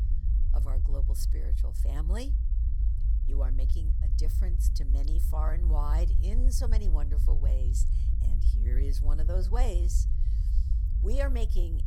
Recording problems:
low rumble; loud; throughout; 7 dB below the speech

